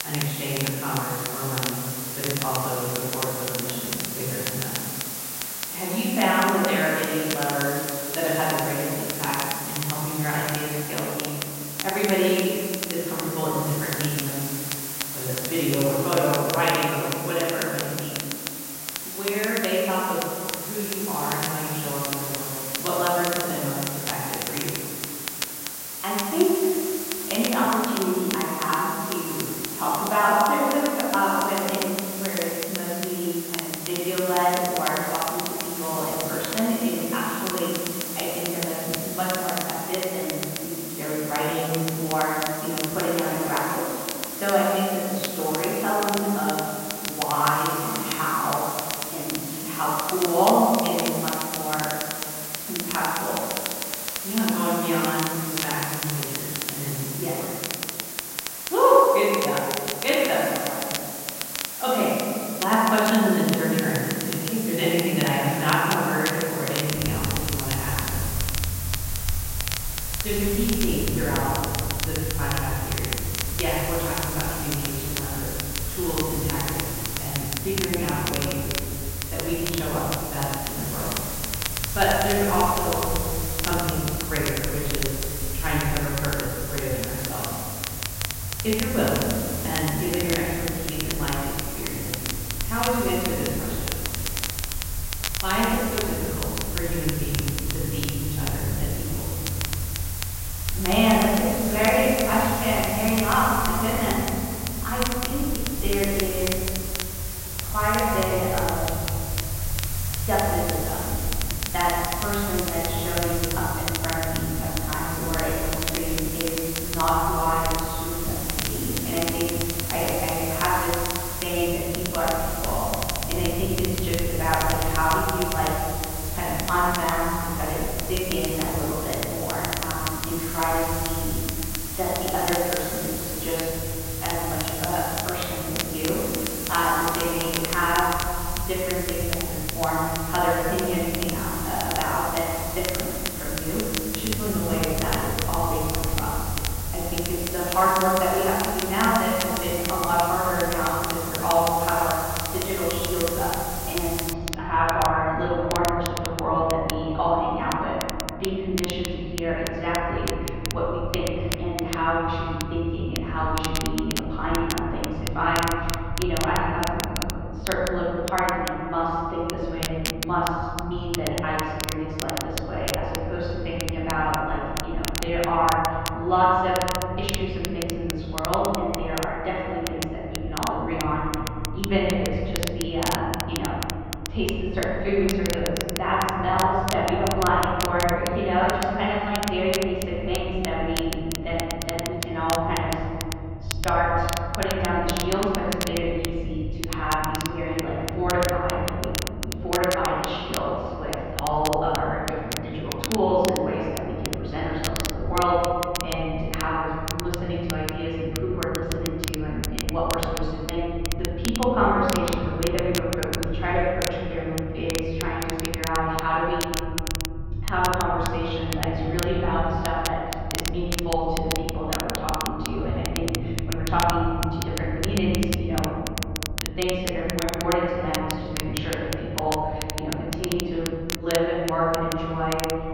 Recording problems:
room echo; strong; dies away in 2.2 s
off-mic speech; far
muffled; very; fading above 3.5 kHz
hiss; loud; until 2:34; 5 dB below the speech
crackle, like an old record; loud; 8 dB below the speech
low rumble; faint; from 1:07 on; 25 dB below the speech

